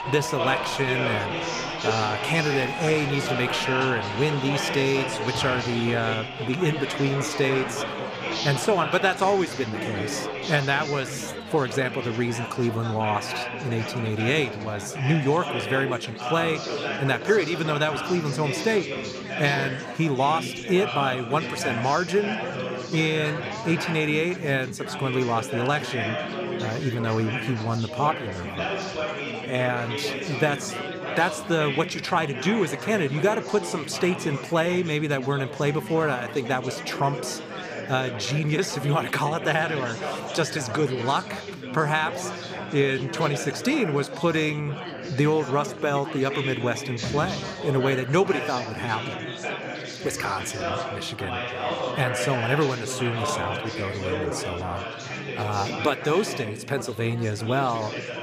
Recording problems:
chatter from many people; loud; throughout; 5 dB below the speech

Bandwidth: 15 kHz